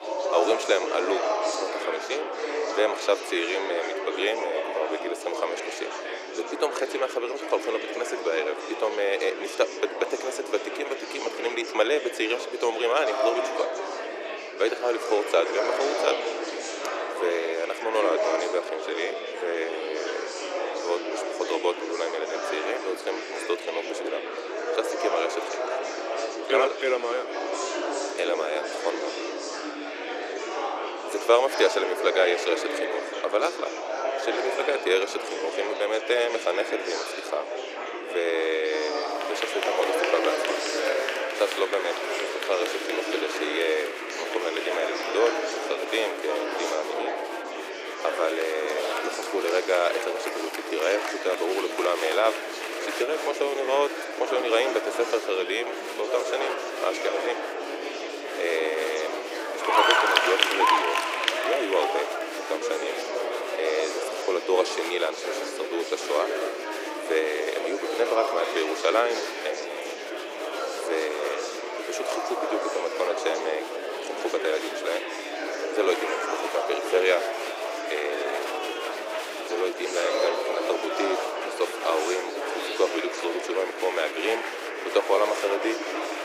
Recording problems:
thin; very; fading below 300 Hz
murmuring crowd; loud; throughout; 2 dB below the speech

